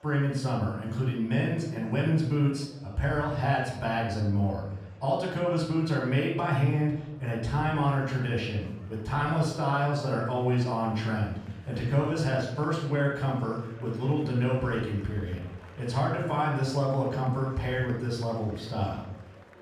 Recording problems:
off-mic speech; far
room echo; noticeable; dies away in 0.7 s
murmuring crowd; faint; throughout; 25 dB below the speech

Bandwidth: 15 kHz